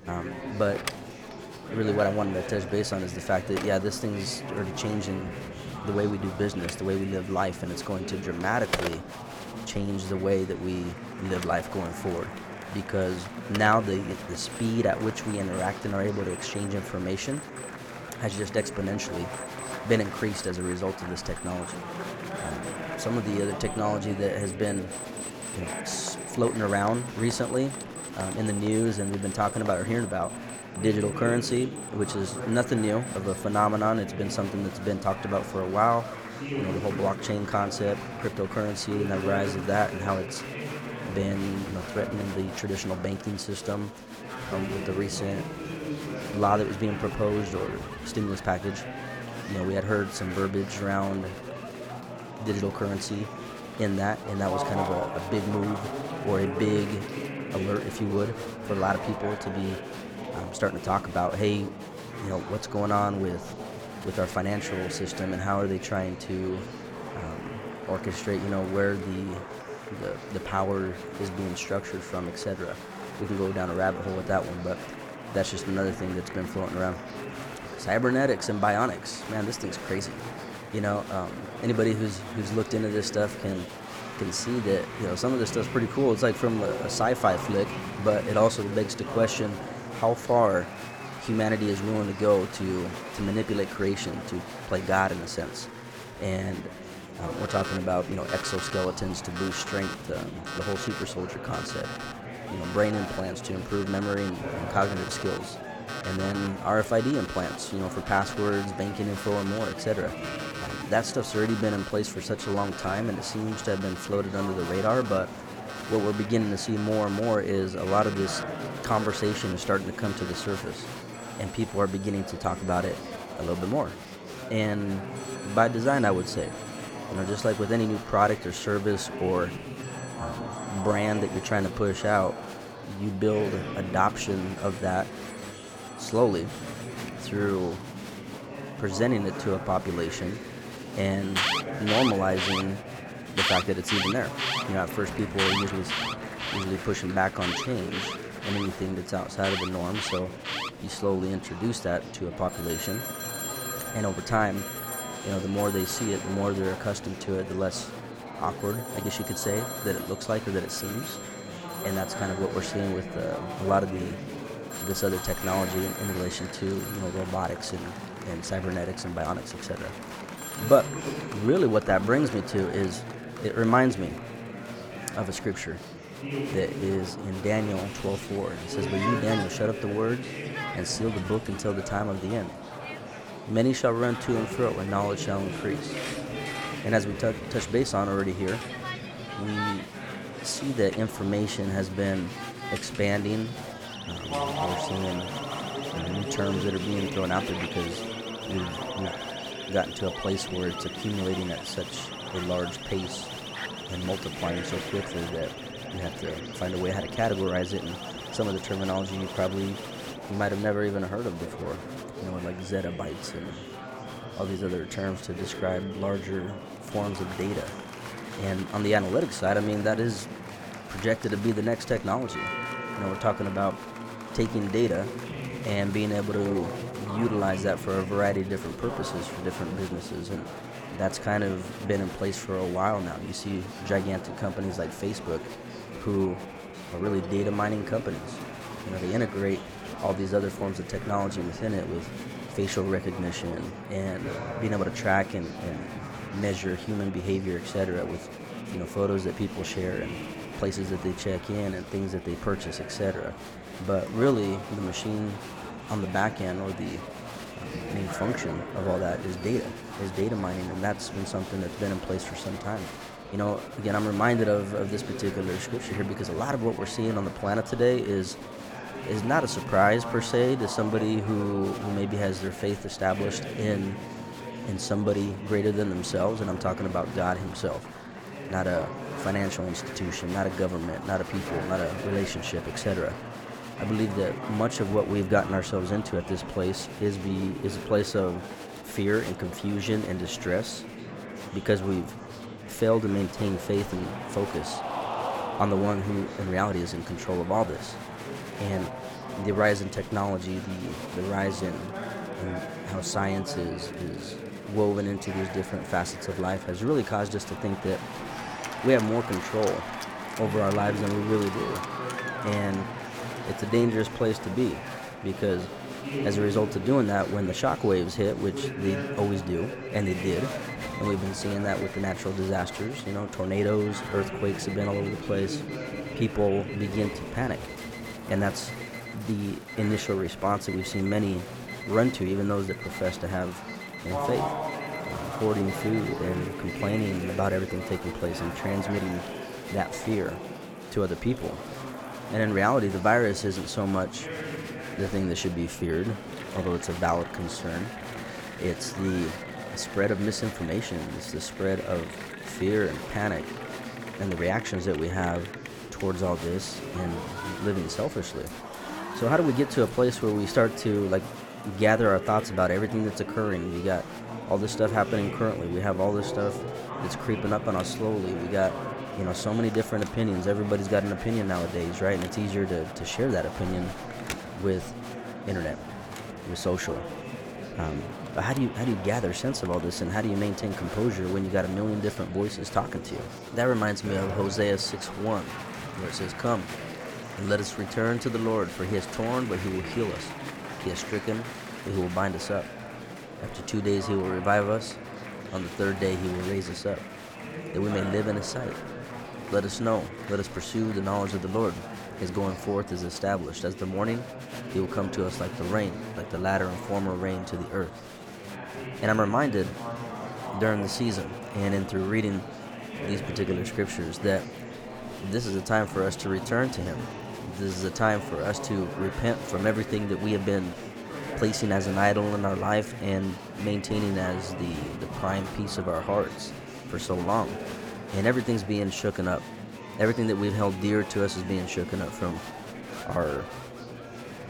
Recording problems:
murmuring crowd; loud; throughout; 8 dB below the speech
alarms or sirens; noticeable; throughout; 10 dB below the speech

